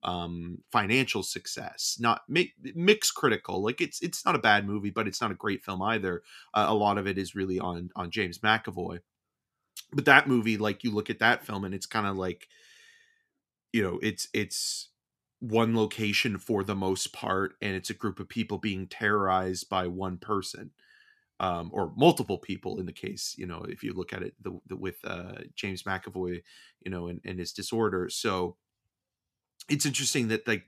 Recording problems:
none

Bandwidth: 14.5 kHz